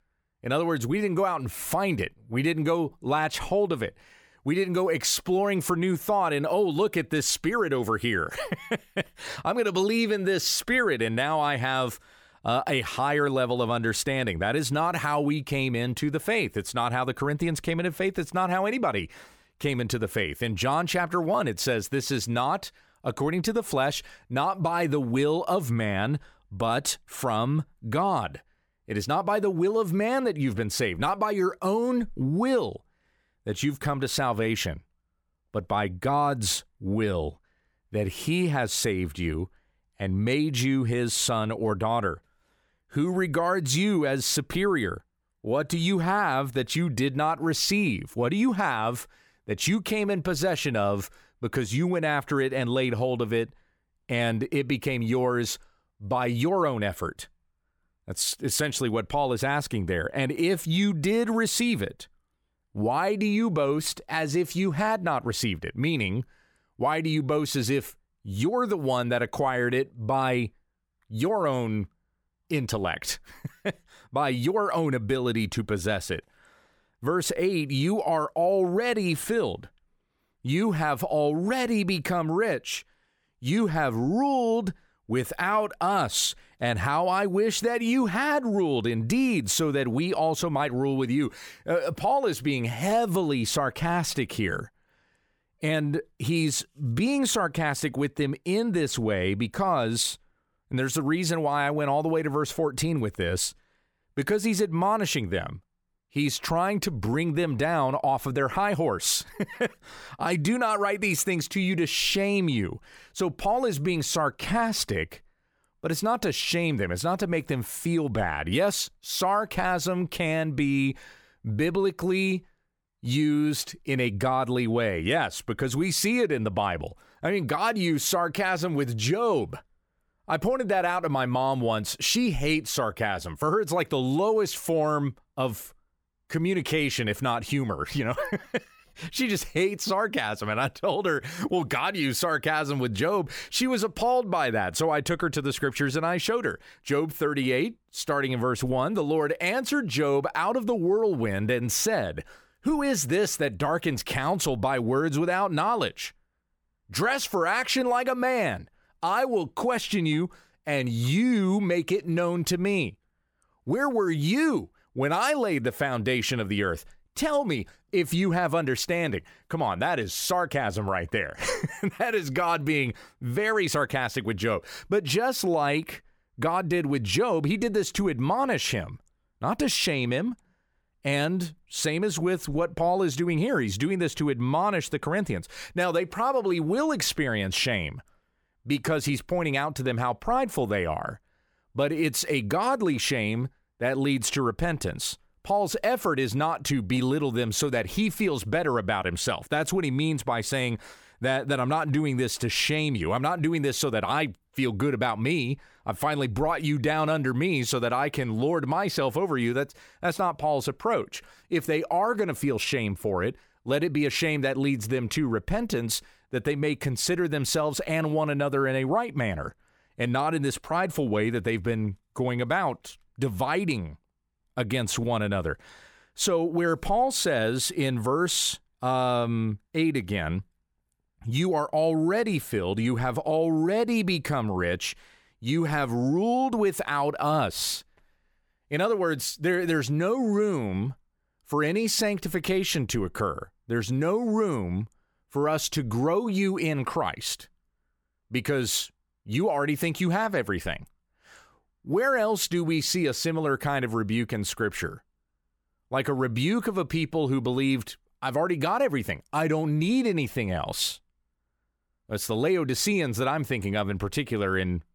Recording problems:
none

